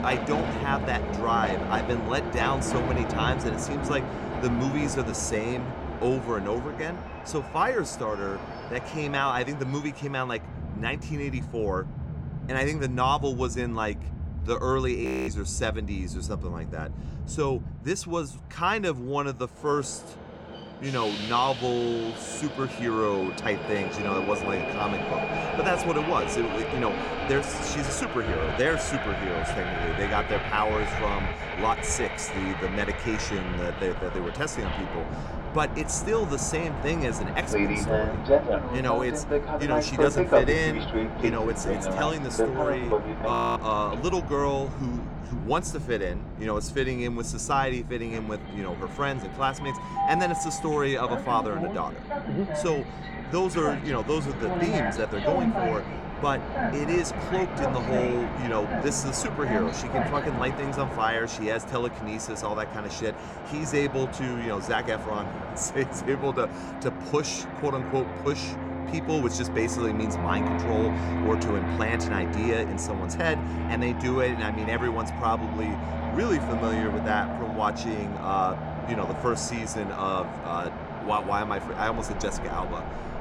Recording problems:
train or aircraft noise; loud; throughout; 2 dB below the speech
audio freezing; at 15 s and at 43 s

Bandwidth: 17.5 kHz